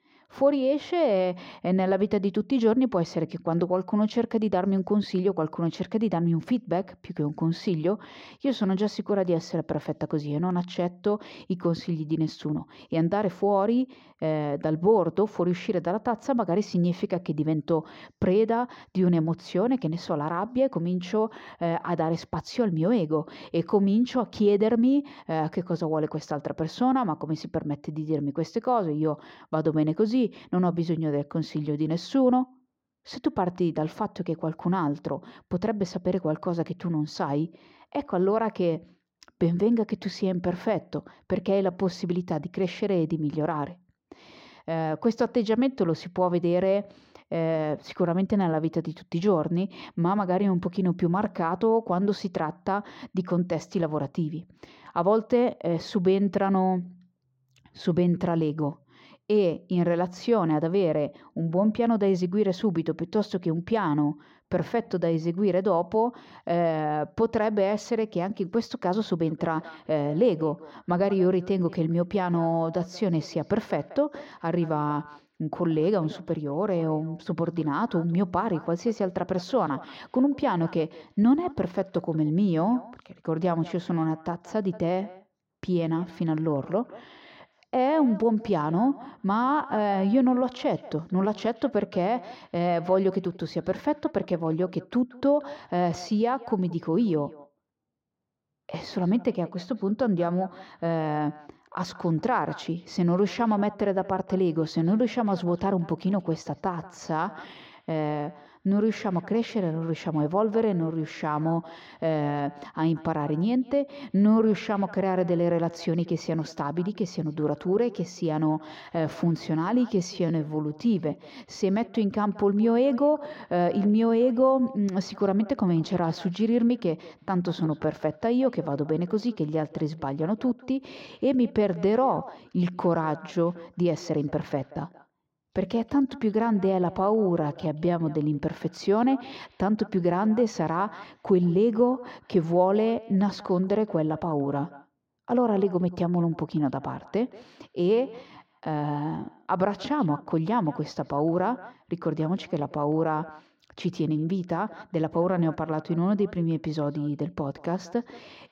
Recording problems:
muffled; slightly; fading above 1.5 kHz
echo of what is said; faint; from 1:09 on; 180 ms later, 20 dB below the speech
uneven, jittery; strongly; from 41 s to 2:29

